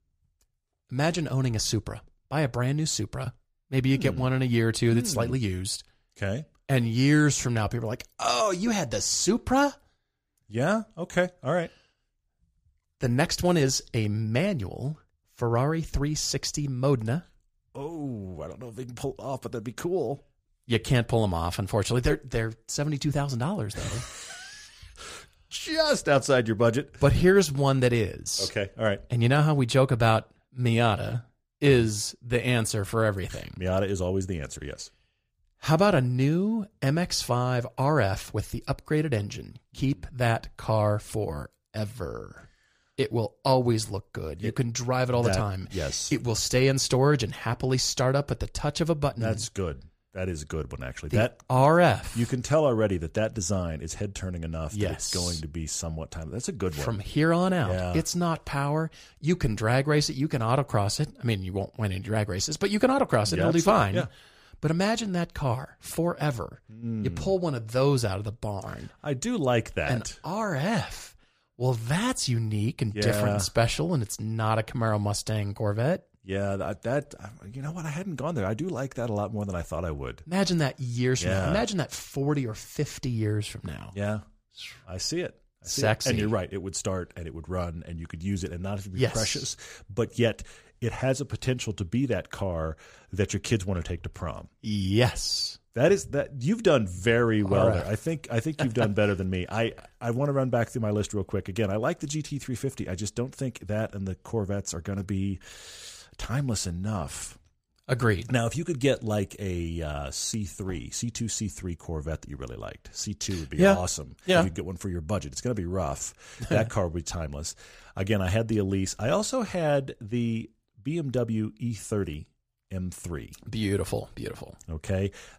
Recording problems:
none

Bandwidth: 14.5 kHz